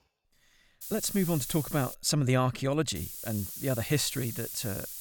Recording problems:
hiss; loud; from 1 to 2 s and from 3 s on; 8 dB below the speech

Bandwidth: 17.5 kHz